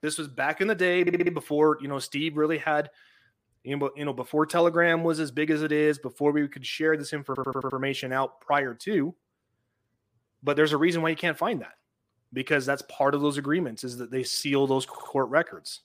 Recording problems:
audio stuttering; at 1 s, at 7.5 s and at 15 s

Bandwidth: 15 kHz